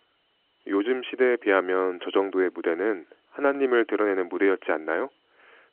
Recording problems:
phone-call audio

